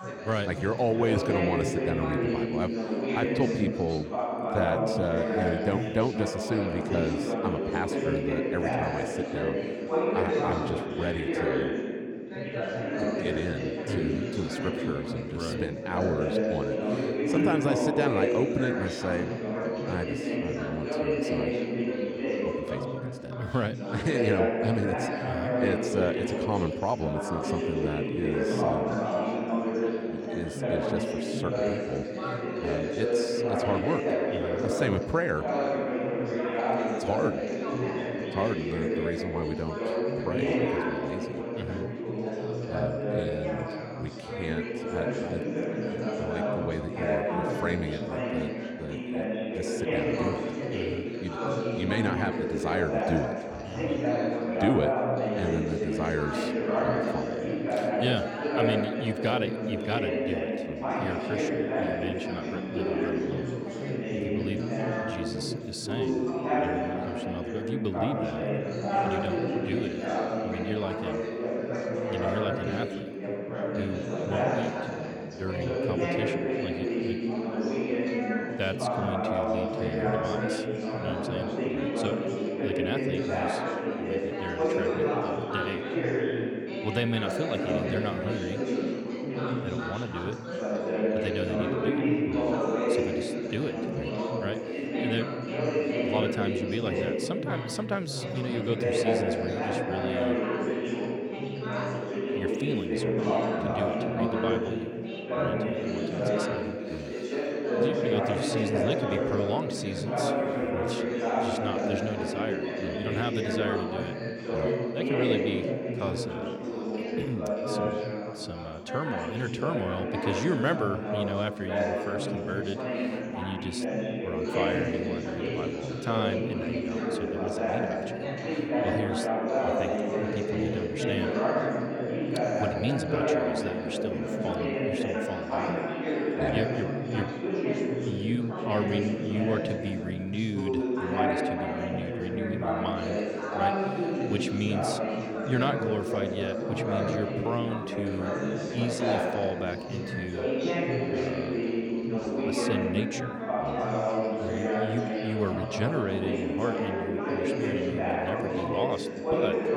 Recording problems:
chatter from many people; very loud; throughout; 4 dB above the speech

